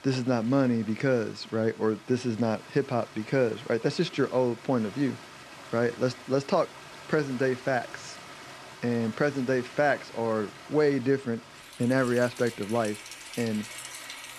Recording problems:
rain or running water; noticeable; throughout; 15 dB below the speech

